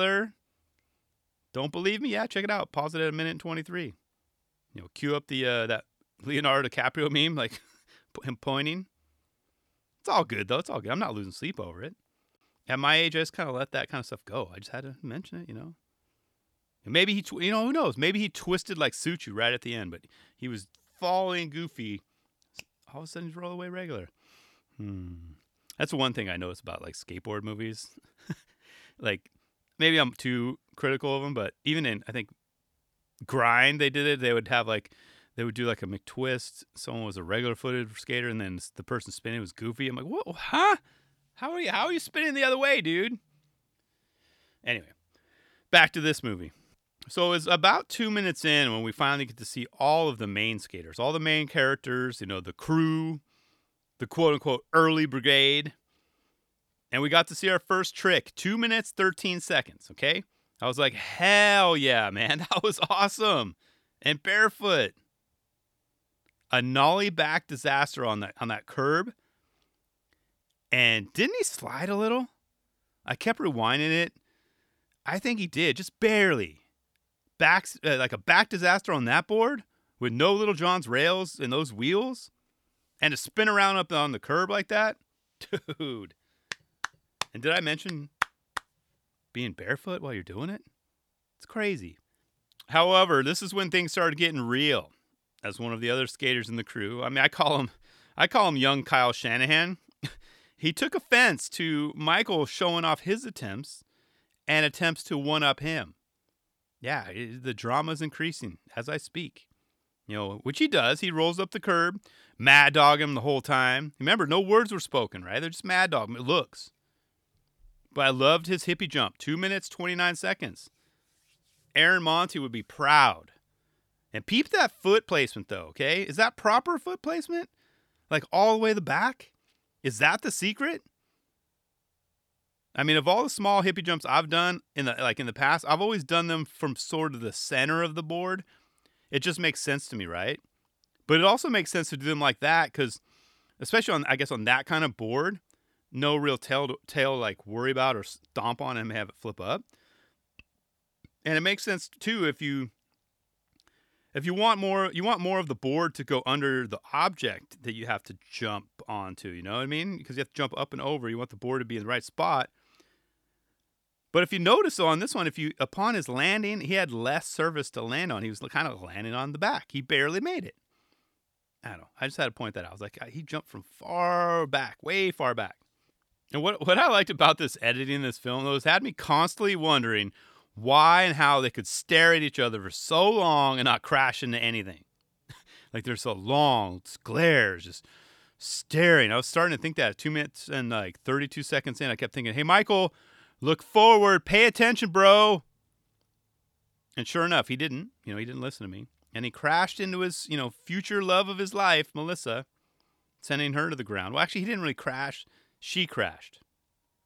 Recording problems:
abrupt cut into speech; at the start

